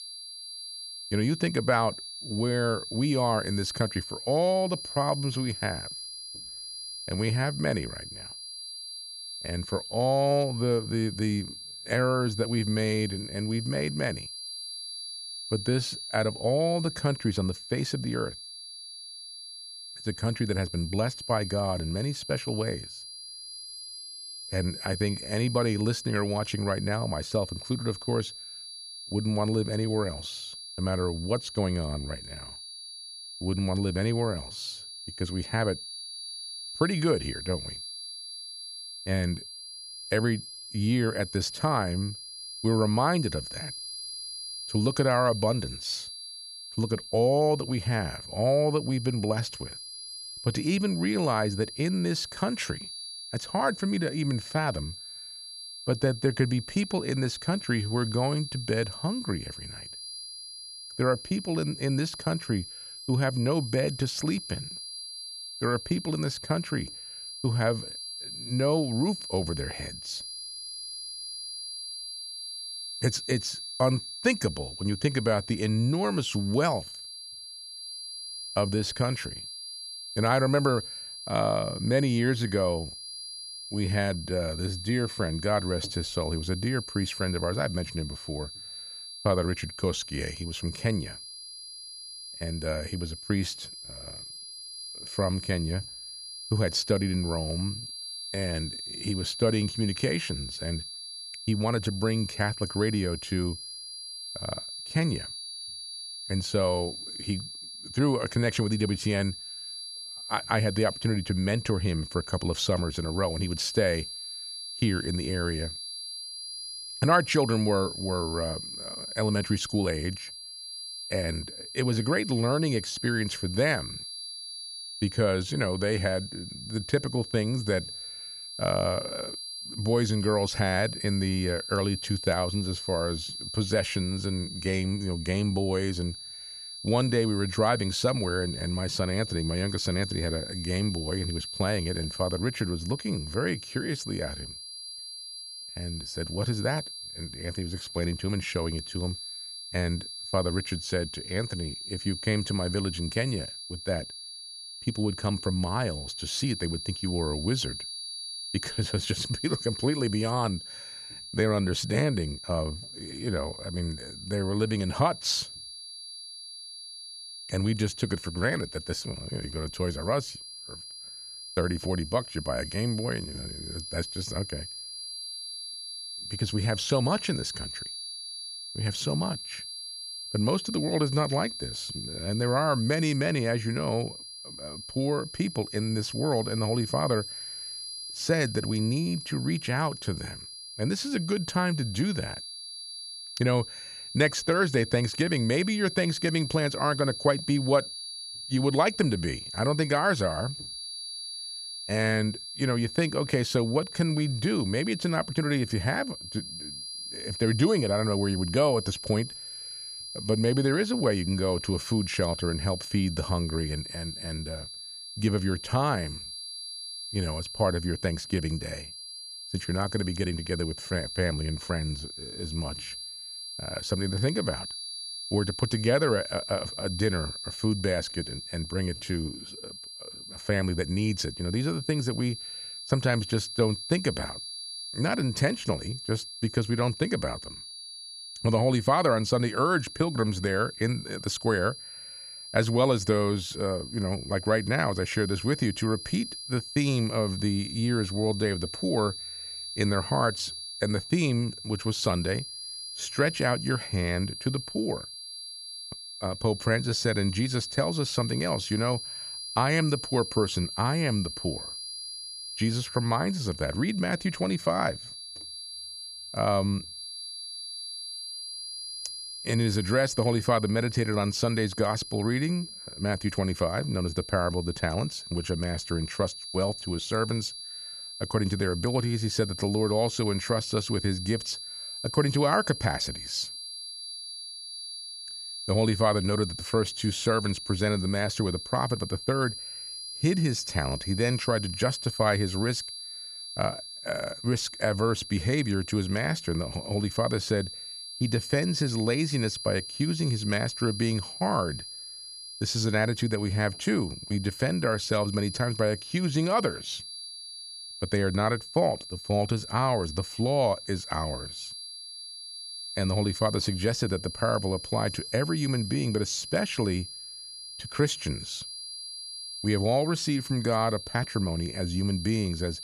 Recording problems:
high-pitched whine; loud; throughout; 4.5 kHz, 8 dB below the speech

